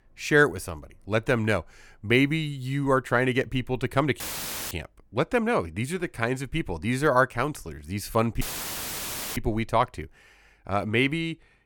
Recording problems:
audio cutting out; filled with static; at 4 s for 0.5 s and at 8.5 s for 1 s

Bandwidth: 18 kHz